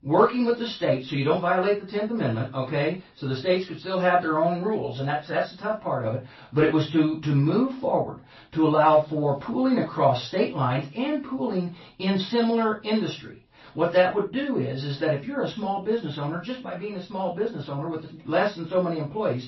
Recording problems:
off-mic speech; far
room echo; noticeable; dies away in 0.2 s
garbled, watery; slightly; nothing above 5.5 kHz

